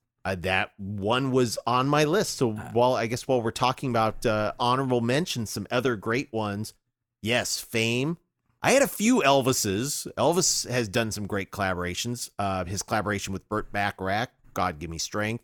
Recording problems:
none

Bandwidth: 18.5 kHz